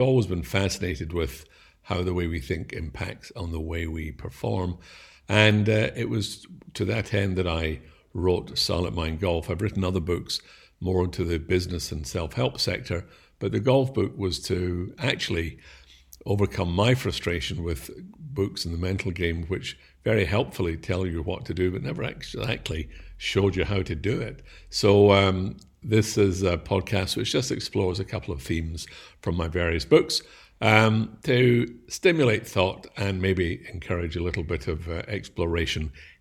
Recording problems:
abrupt cut into speech; at the start

